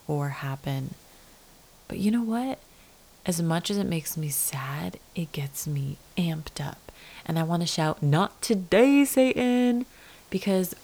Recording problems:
hiss; faint; throughout; 25 dB below the speech

